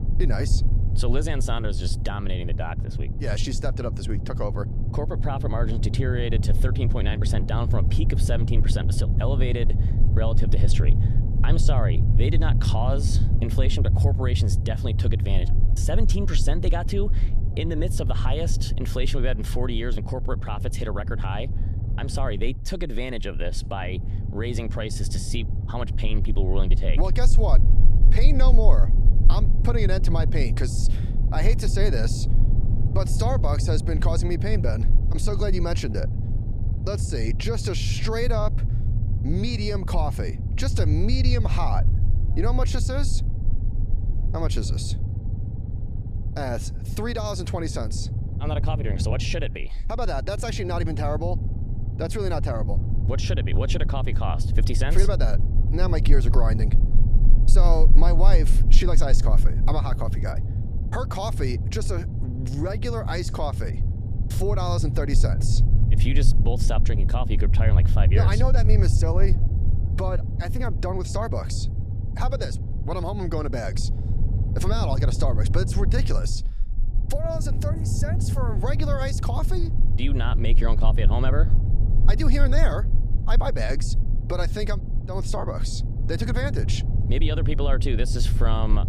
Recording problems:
low rumble; loud; throughout; 8 dB below the speech

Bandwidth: 15 kHz